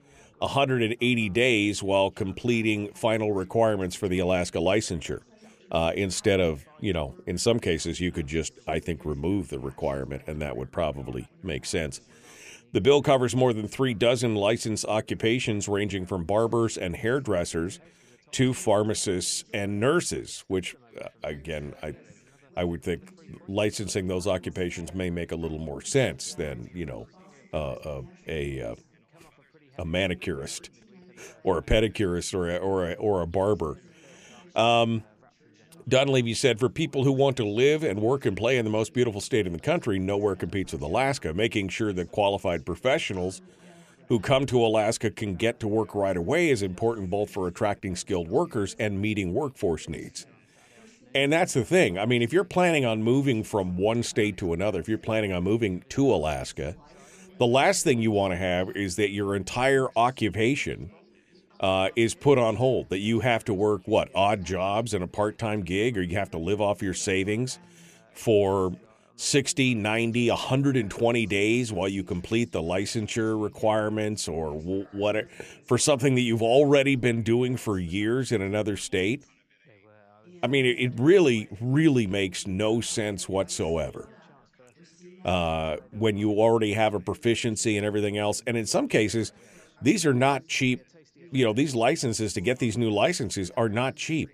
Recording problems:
background chatter; faint; throughout; 3 voices, 30 dB below the speech

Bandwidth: 14.5 kHz